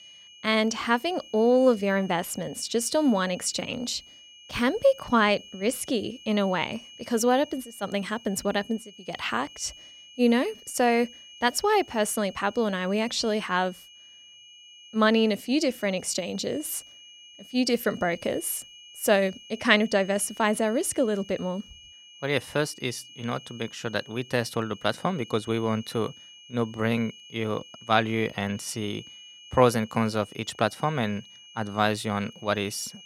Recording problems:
high-pitched whine; noticeable; throughout; 3 kHz, 20 dB below the speech

